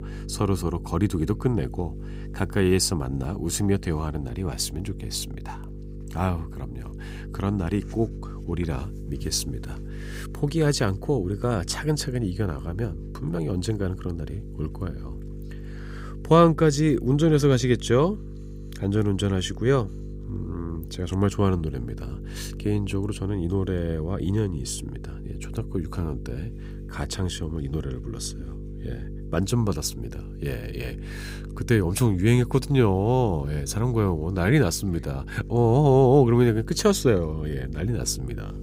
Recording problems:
electrical hum; noticeable; throughout; 50 Hz, 20 dB below the speech

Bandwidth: 15.5 kHz